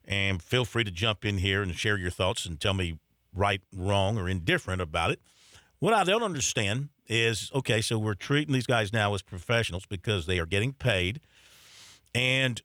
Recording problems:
uneven, jittery; strongly; from 1 to 11 s

